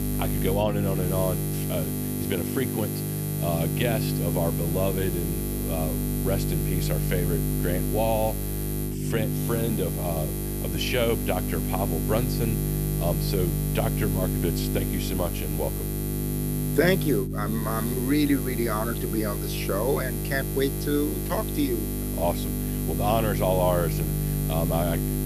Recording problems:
electrical hum; loud; throughout; 50 Hz, 5 dB below the speech

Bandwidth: 14.5 kHz